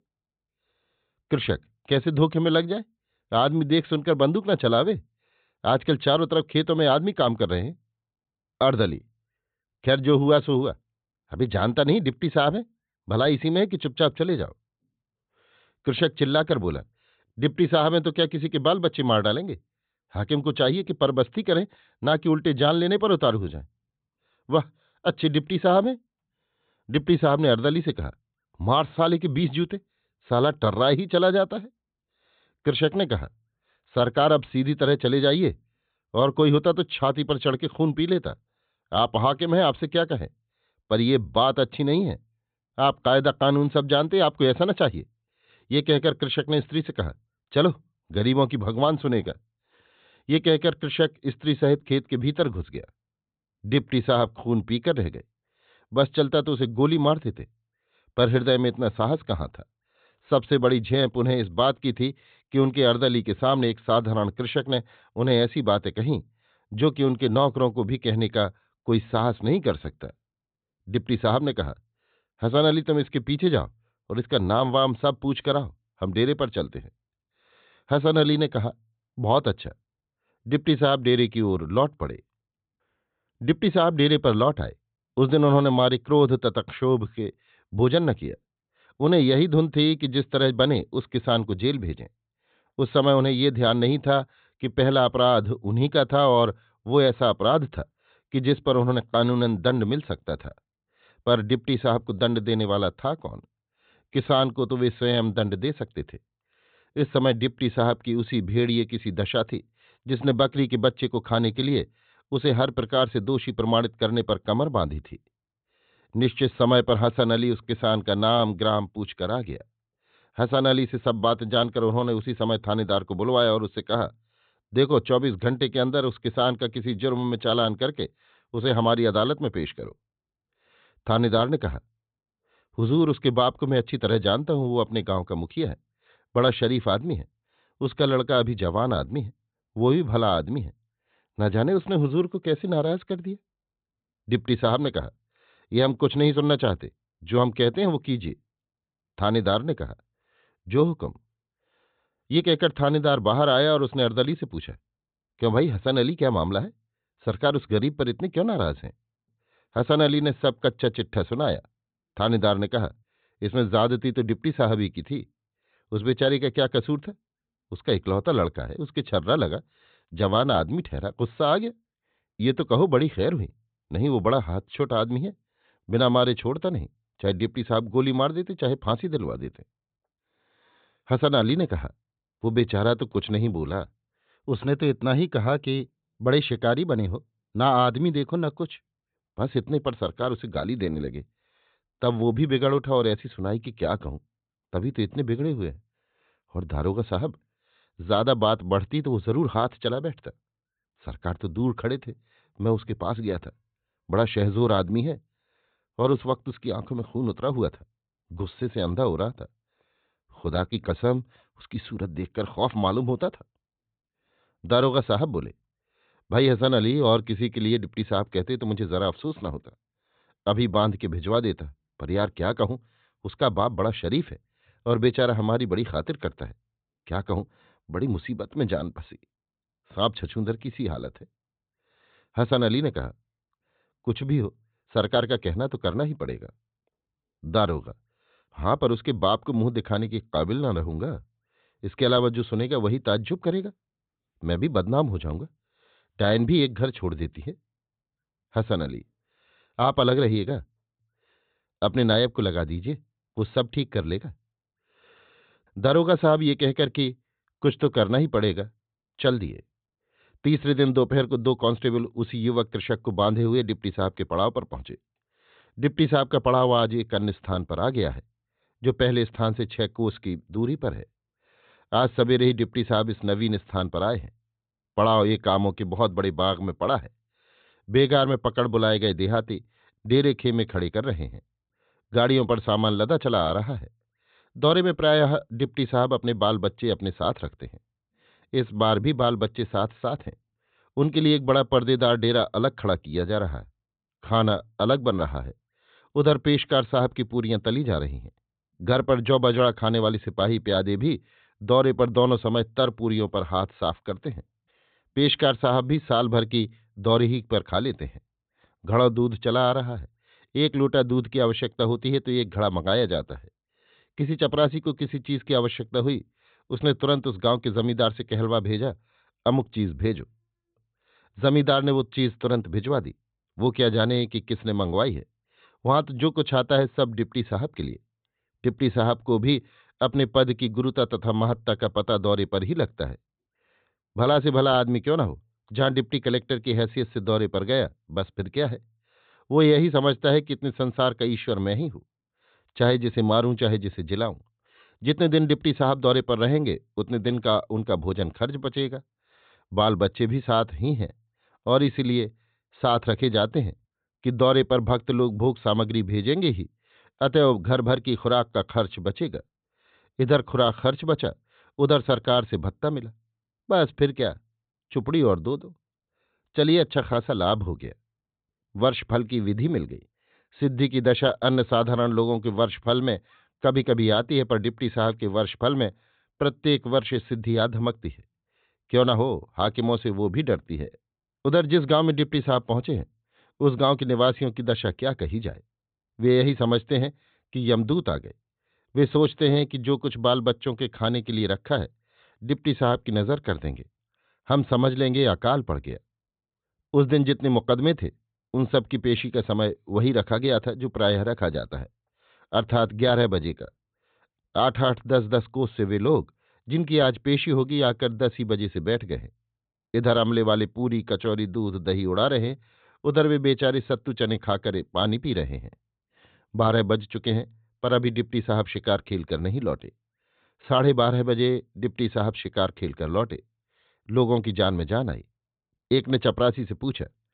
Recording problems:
high frequencies cut off; severe; nothing above 4 kHz

